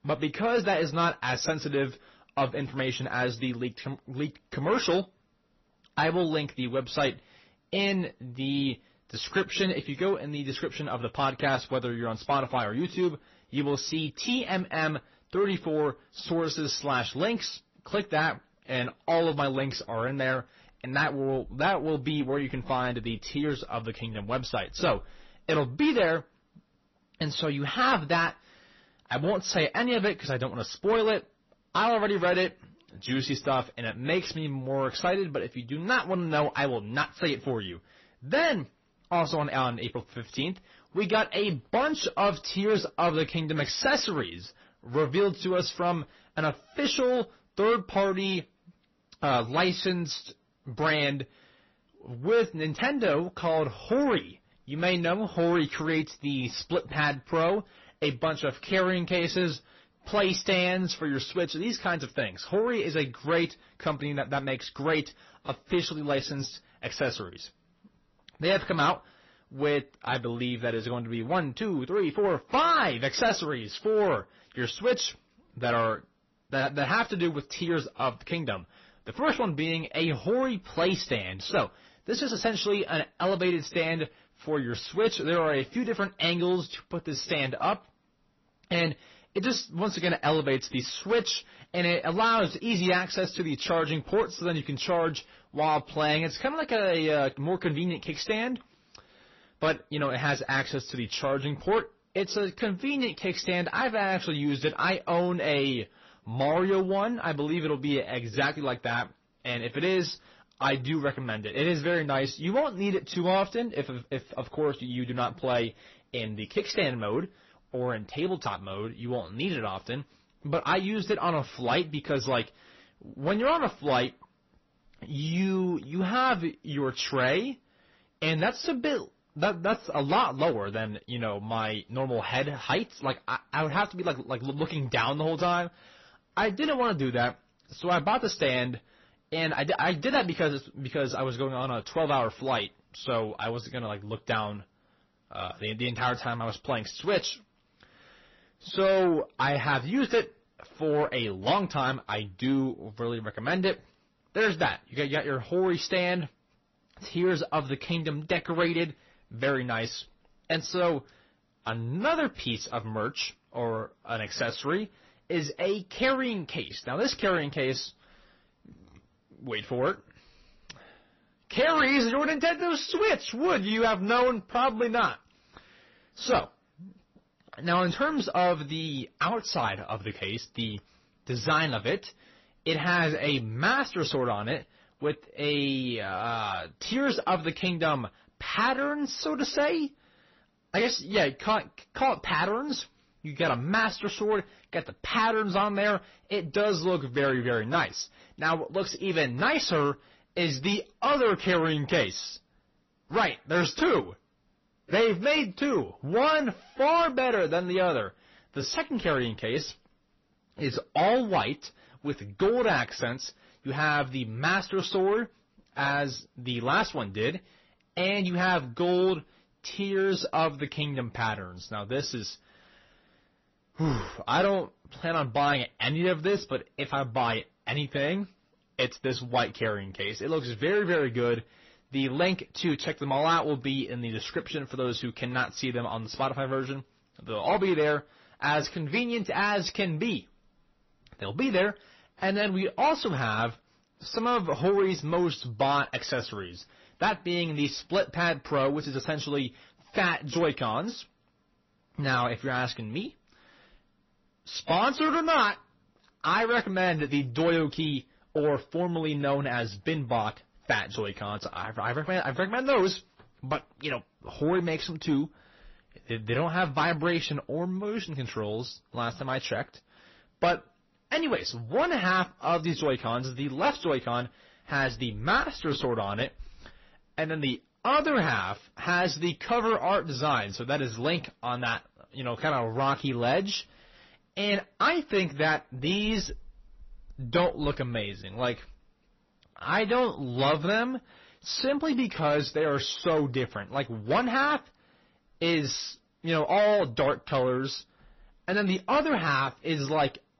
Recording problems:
distortion; slight; 10 dB below the speech
garbled, watery; slightly; nothing above 6 kHz

